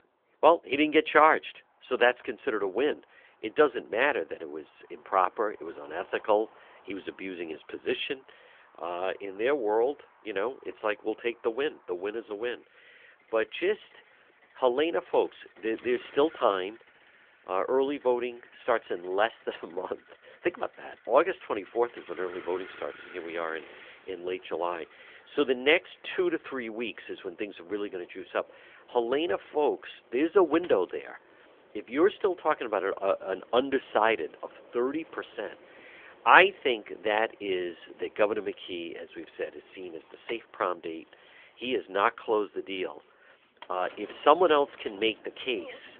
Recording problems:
phone-call audio; nothing above 3.5 kHz
traffic noise; faint; throughout; 25 dB below the speech

